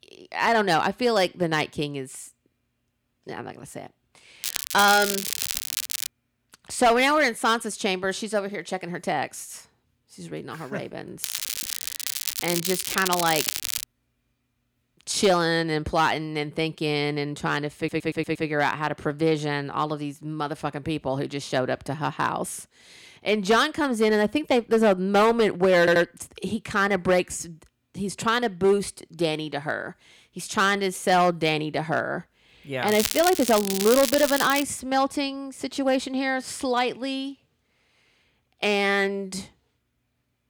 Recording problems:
distortion; slight; 3% of the sound clipped
crackling; loud; from 4.5 to 6 s, from 11 to 14 s and from 33 to 35 s; 4 dB below the speech
audio stuttering; at 18 s and at 26 s

